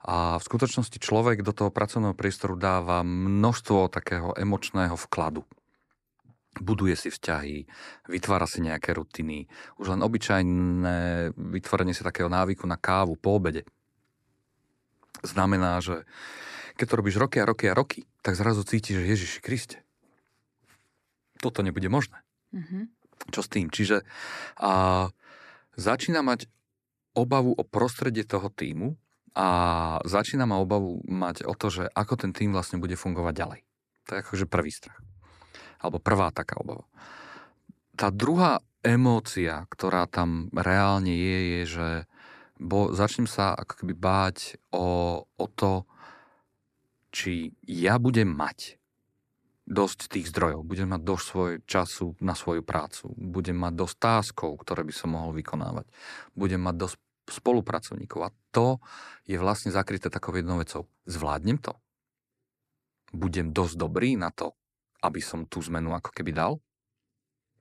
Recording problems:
none

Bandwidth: 13.5 kHz